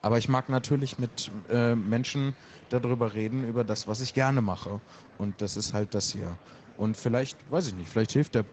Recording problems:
garbled, watery; slightly; nothing above 7.5 kHz
murmuring crowd; faint; throughout; 25 dB below the speech

